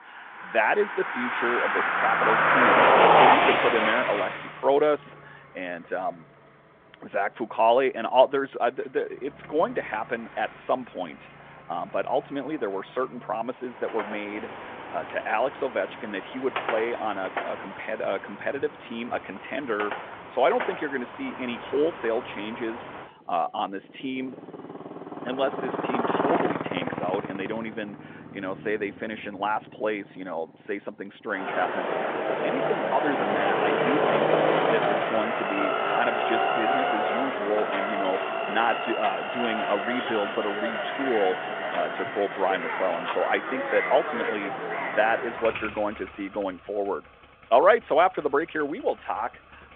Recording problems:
phone-call audio; nothing above 3.5 kHz
traffic noise; very loud; throughout; 2 dB above the speech

